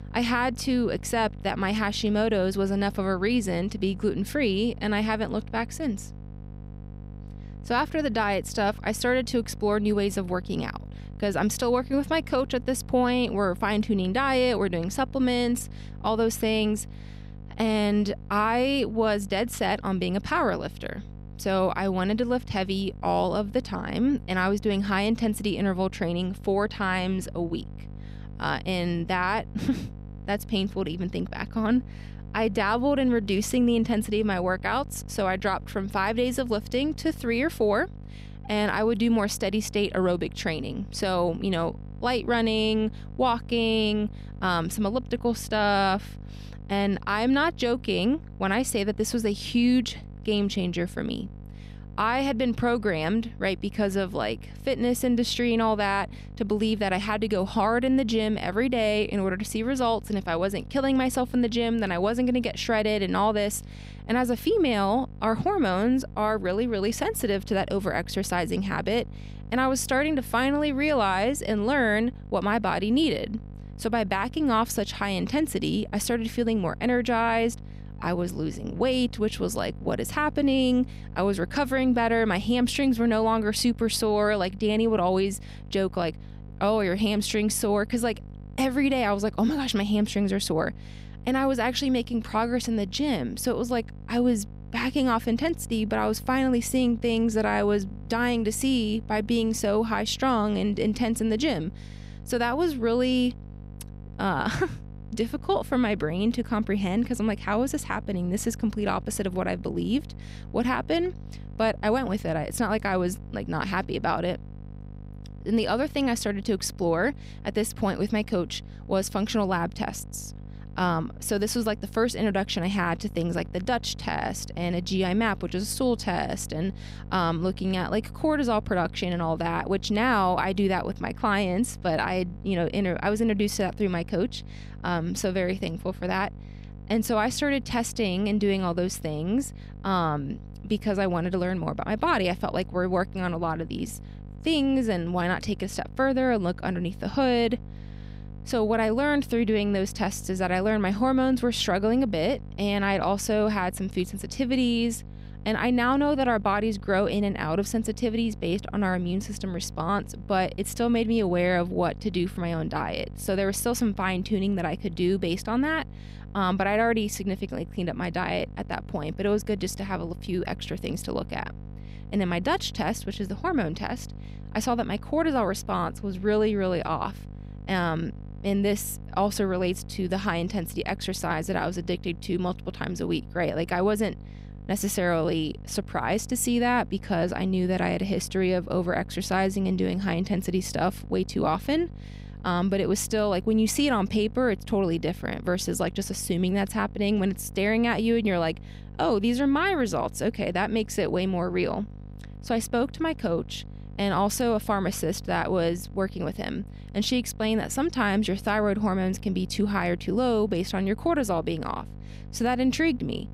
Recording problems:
electrical hum; faint; throughout; 50 Hz, 25 dB below the speech

